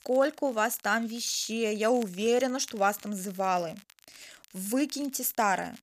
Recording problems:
crackle, like an old record; faint; 25 dB below the speech

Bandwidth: 14.5 kHz